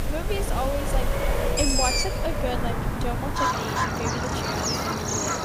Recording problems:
animal sounds; very loud; throughout; 5 dB above the speech
traffic noise; very loud; throughout; 2 dB above the speech

